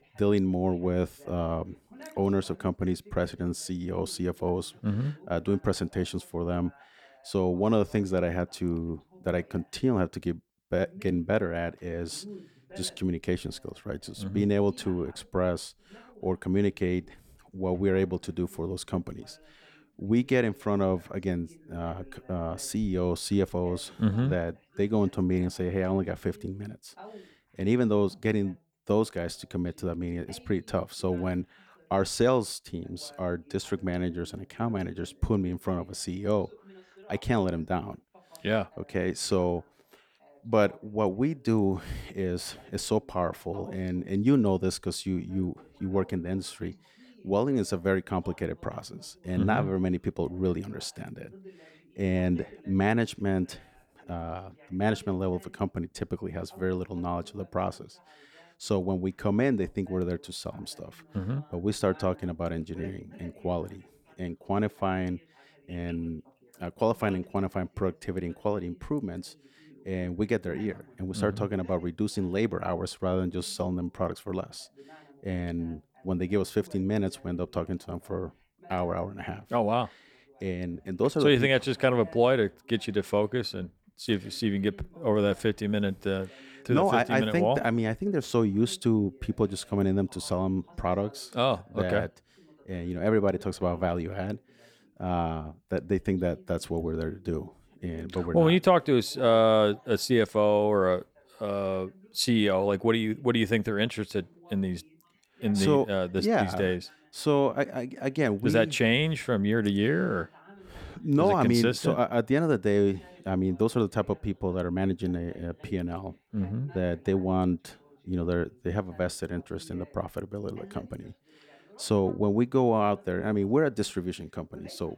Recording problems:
voice in the background; faint; throughout; 25 dB below the speech

